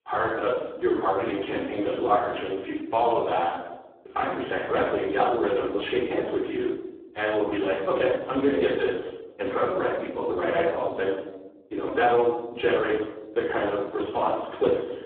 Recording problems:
phone-call audio; poor line
room echo; noticeable; dies away in 1.2 s
off-mic speech; somewhat distant

